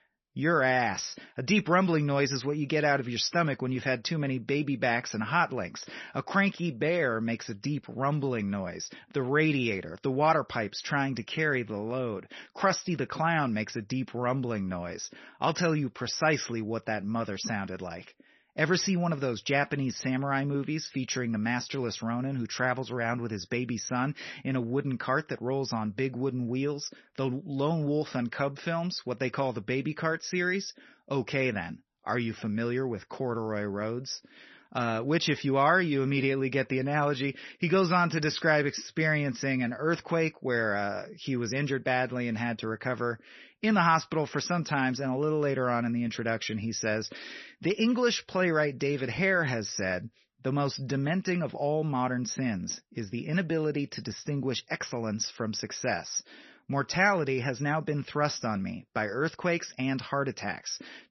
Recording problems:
garbled, watery; slightly; nothing above 6 kHz

